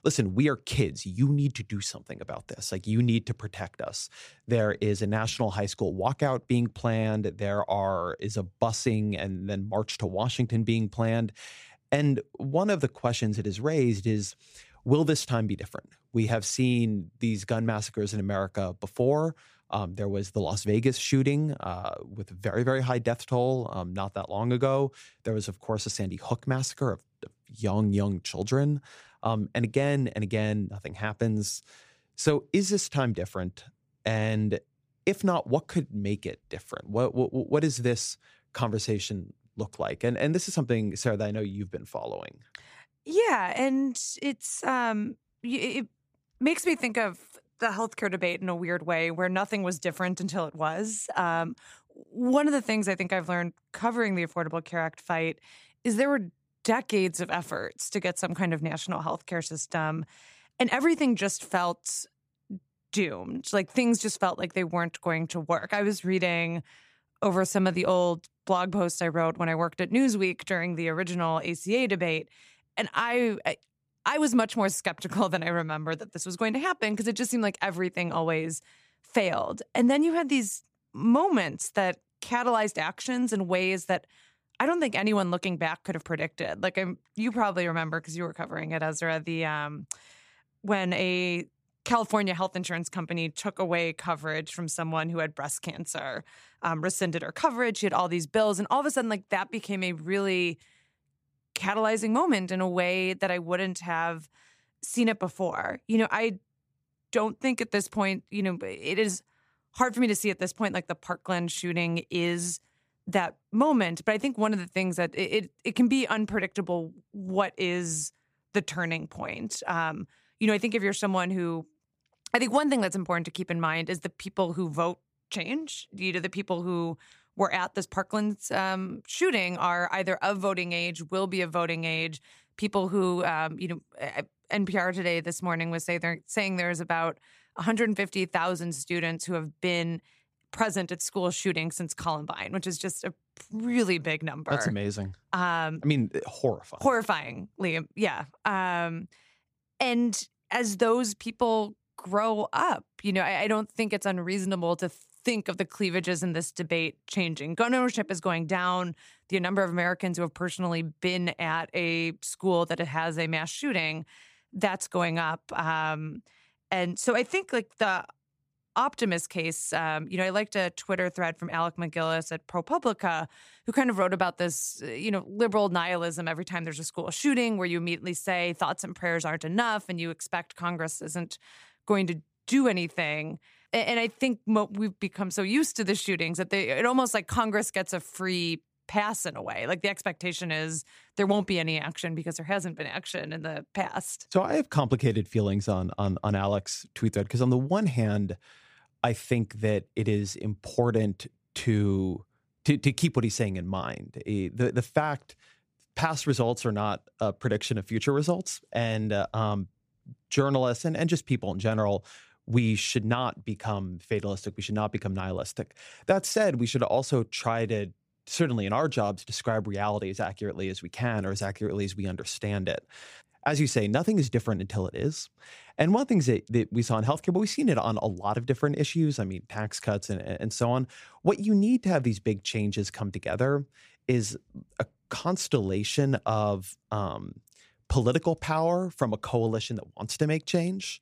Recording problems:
none

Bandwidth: 15 kHz